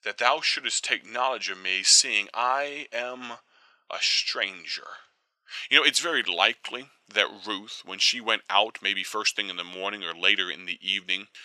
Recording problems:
thin; very; fading below 800 Hz

